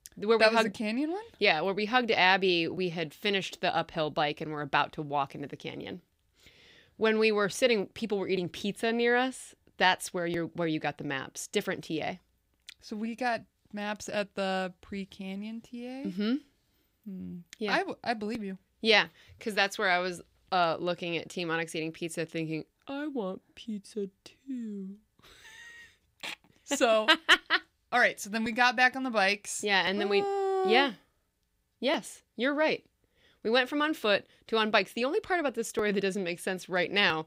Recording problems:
none

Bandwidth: 15.5 kHz